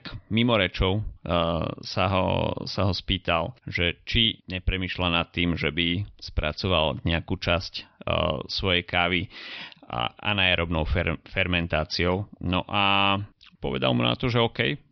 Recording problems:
high frequencies cut off; noticeable; nothing above 5.5 kHz

